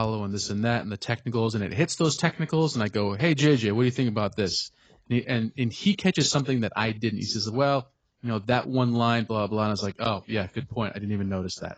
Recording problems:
garbled, watery; badly; nothing above 7.5 kHz
abrupt cut into speech; at the start

